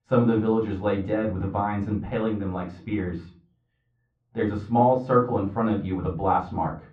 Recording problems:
off-mic speech; far
muffled; very; fading above 1 kHz
room echo; very slight; dies away in 0.3 s

